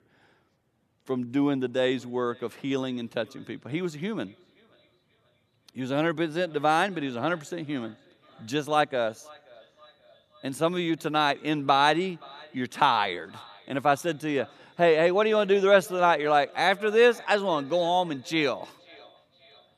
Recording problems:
echo of what is said; faint; throughout; 530 ms later, 25 dB below the speech

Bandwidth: 14 kHz